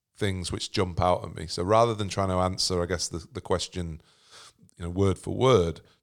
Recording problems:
none

